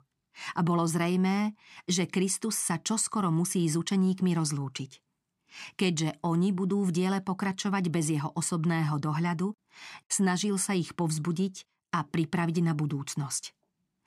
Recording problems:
none

